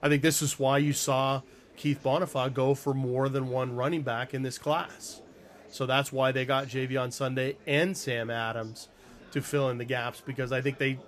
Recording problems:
murmuring crowd; faint; throughout; 25 dB below the speech

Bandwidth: 14.5 kHz